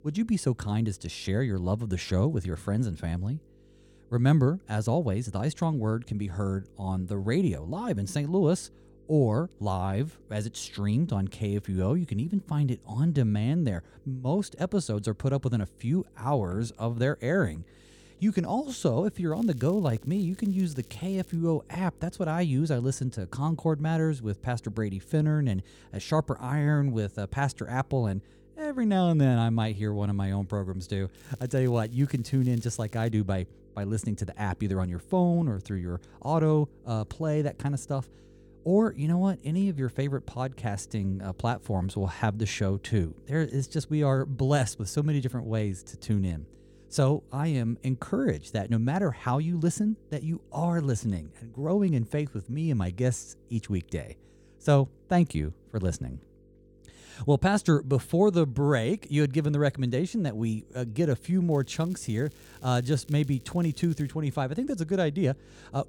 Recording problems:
electrical hum; faint; throughout; 50 Hz, 30 dB below the speech
crackling; faint; from 19 to 21 s, from 31 to 33 s and from 1:02 to 1:04; 25 dB below the speech

